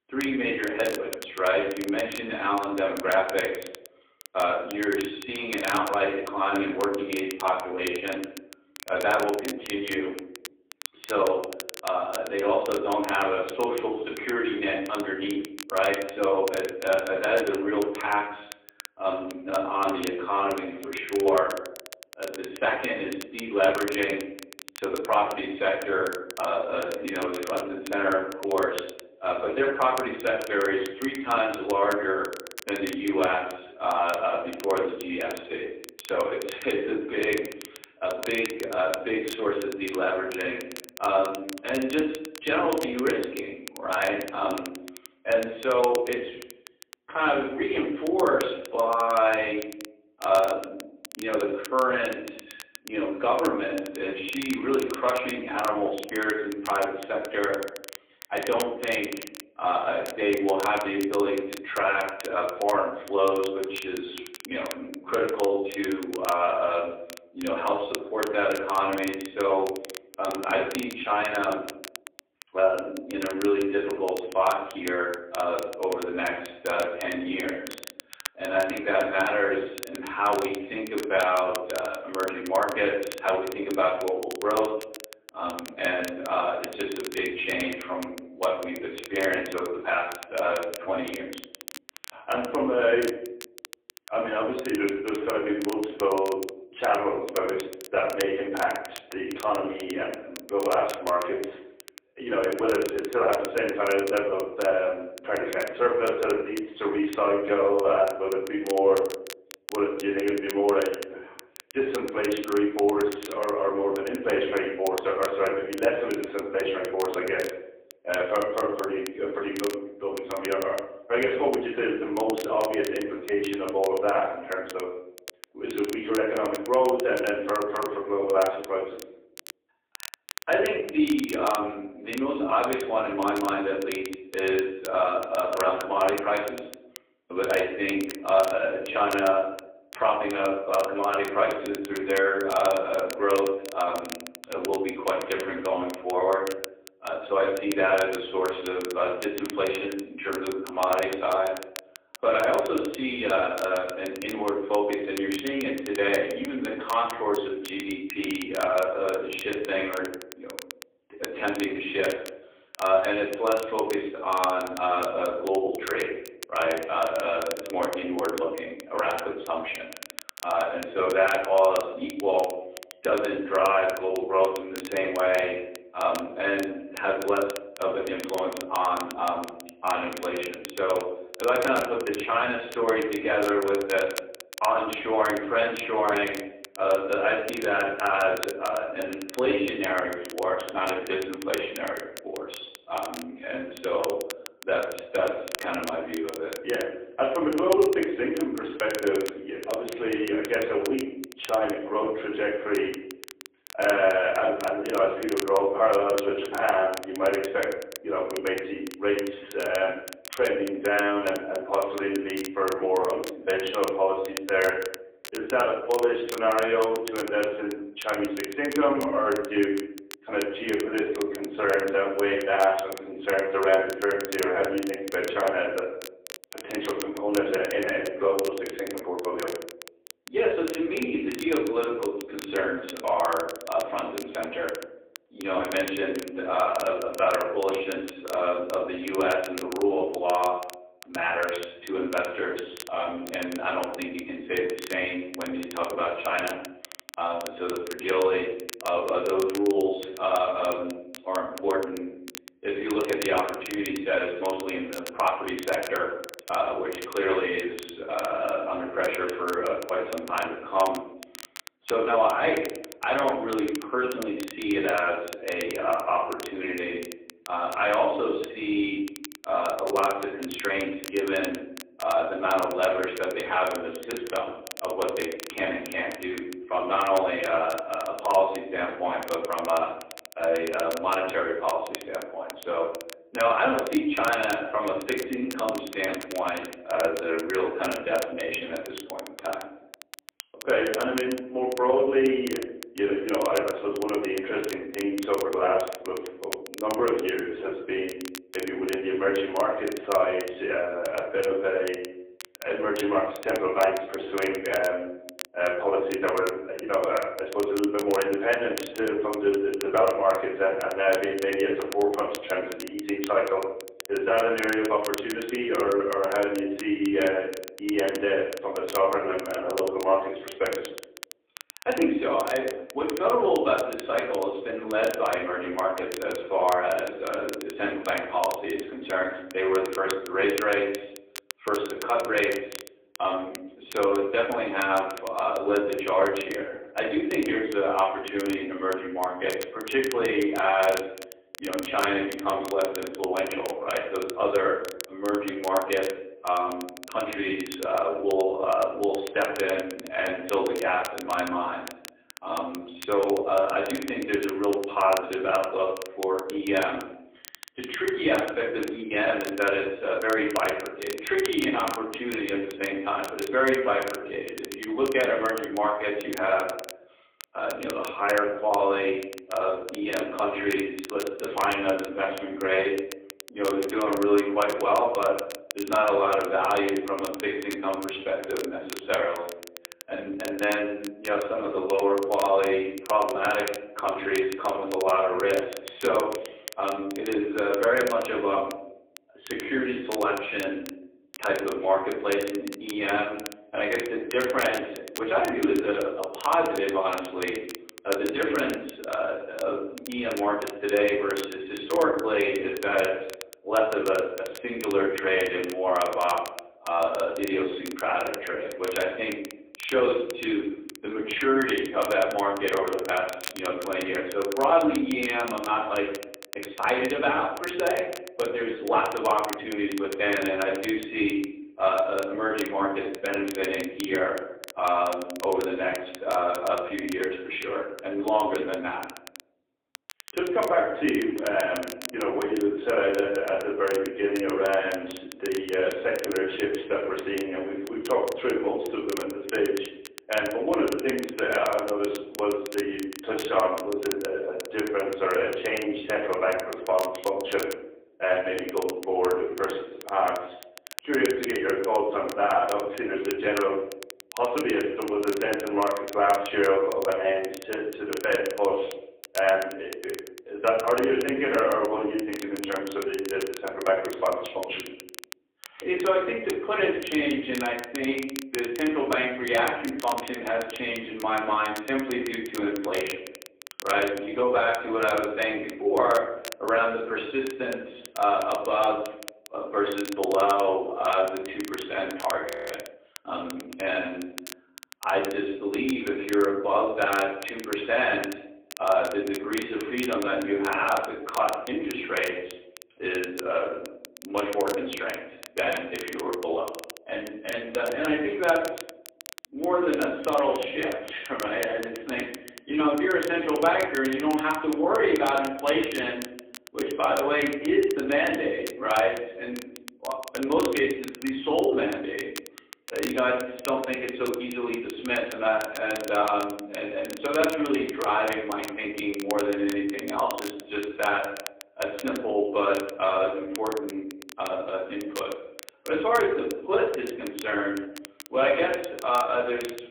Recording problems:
phone-call audio; poor line; nothing above 3.5 kHz
off-mic speech; far
room echo; slight; dies away in 0.7 s
crackle, like an old record; noticeable; 15 dB below the speech
audio freezing; at 8:02

